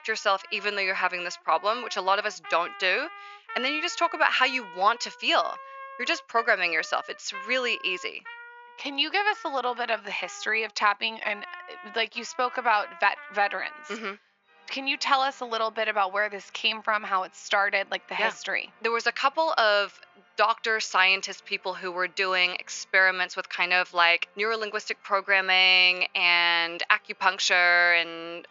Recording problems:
thin; very; fading below 850 Hz
high frequencies cut off; noticeable; nothing above 7 kHz
background music; noticeable; throughout; 20 dB below the speech

